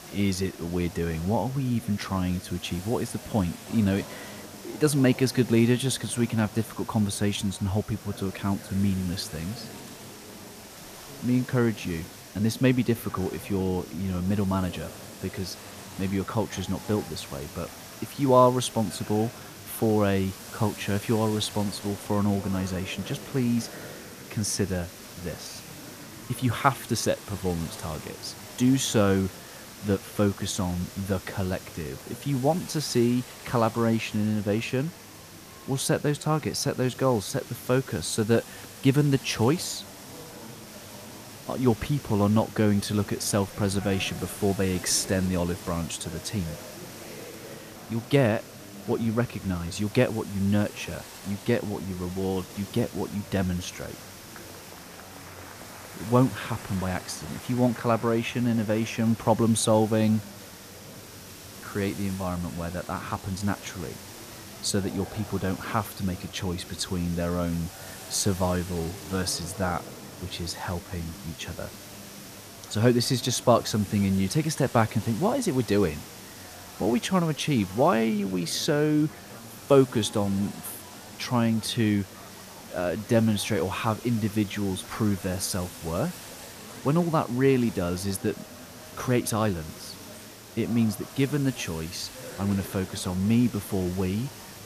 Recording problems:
murmuring crowd; noticeable; throughout; 20 dB below the speech
hiss; noticeable; throughout; 15 dB below the speech
crackling; faint; from 21 to 23 s and at 1:30; 25 dB below the speech

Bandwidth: 14.5 kHz